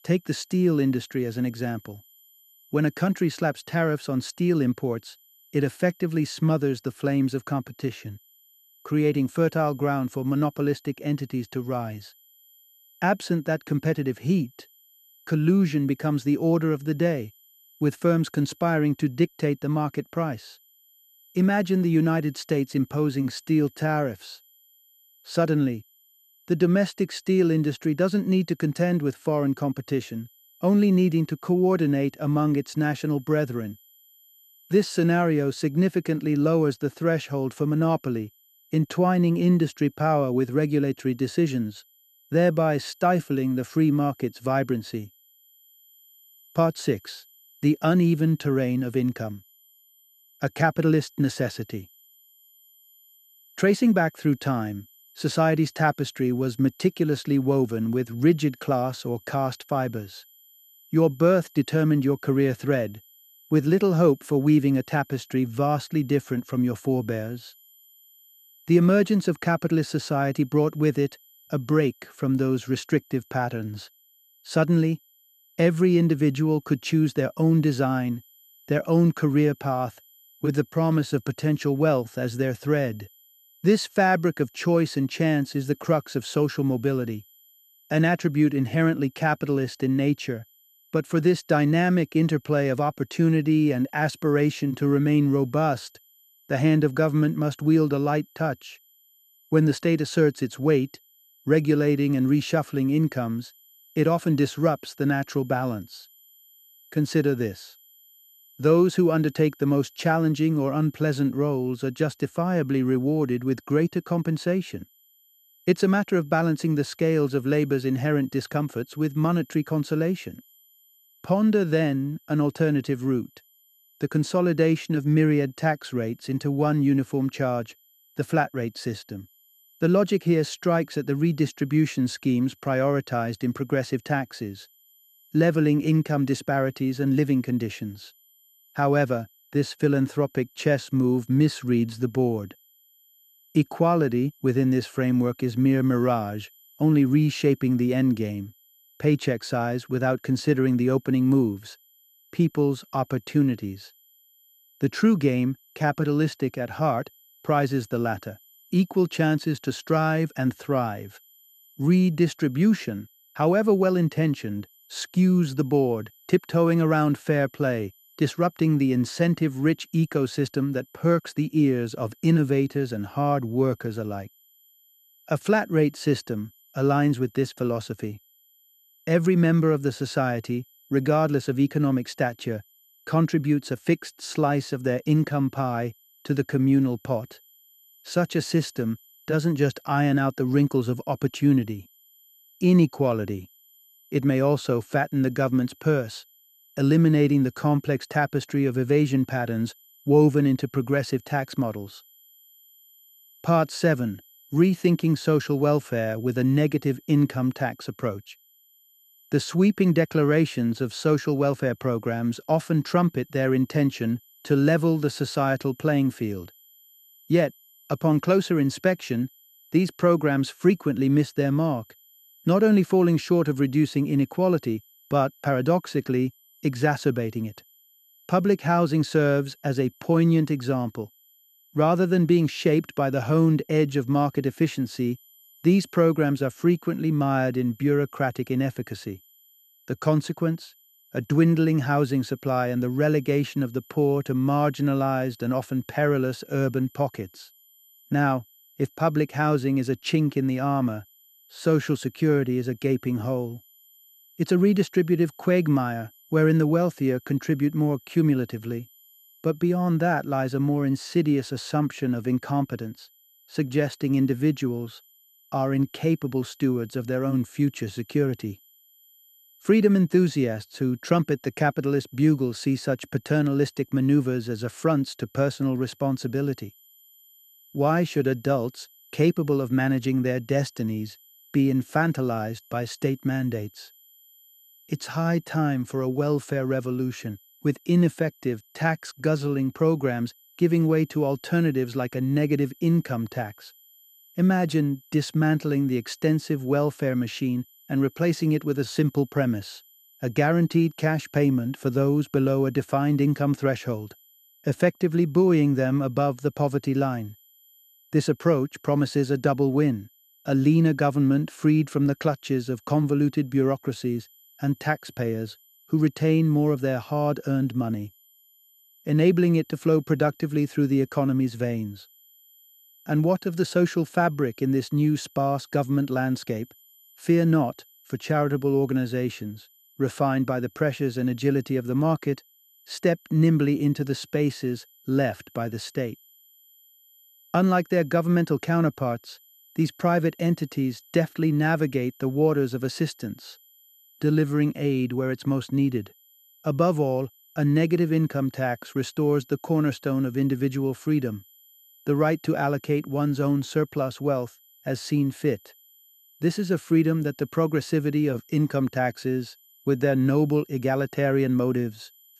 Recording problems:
high-pitched whine; faint; throughout; 12 kHz, 30 dB below the speech

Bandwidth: 13.5 kHz